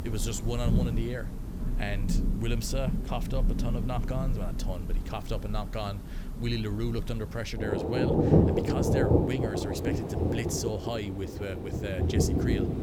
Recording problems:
rain or running water; very loud; throughout; 5 dB above the speech

